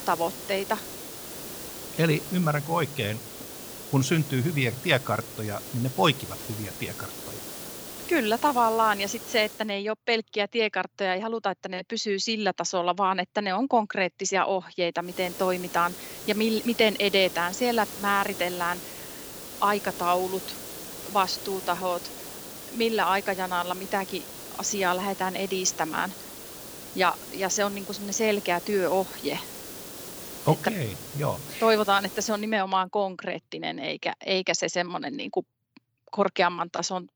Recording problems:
hiss; noticeable; until 9.5 s and from 15 to 32 s; 10 dB below the speech

